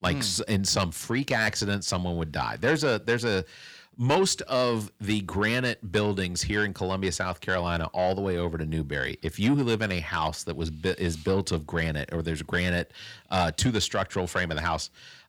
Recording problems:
distortion; slight; 10 dB below the speech

